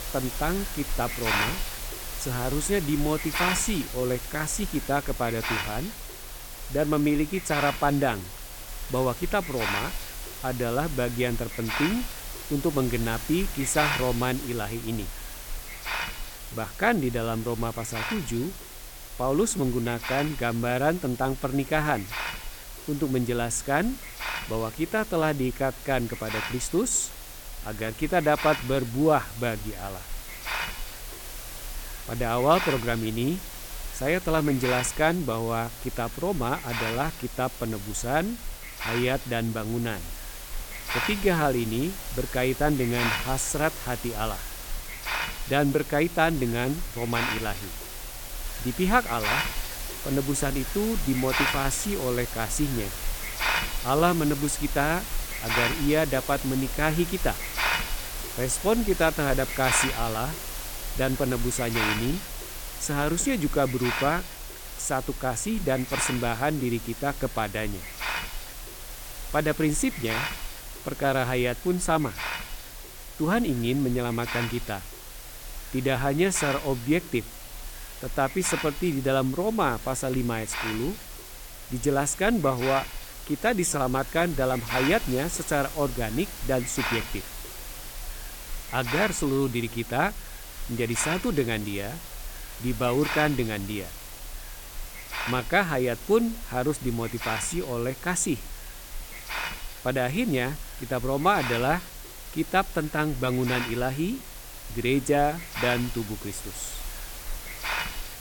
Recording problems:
hiss; loud; throughout; 7 dB below the speech

